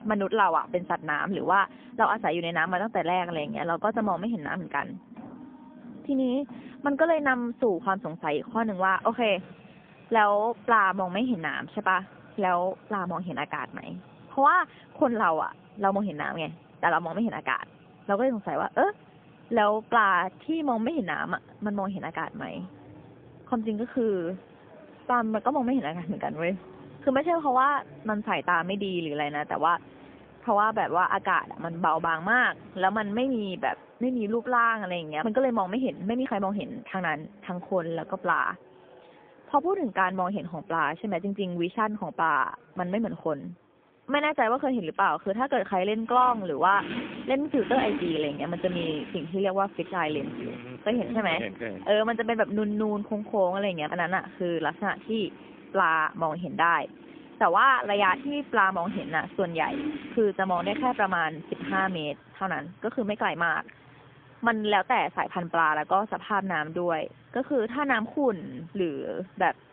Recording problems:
phone-call audio; poor line; nothing above 3.5 kHz
traffic noise; noticeable; throughout; 20 dB below the speech

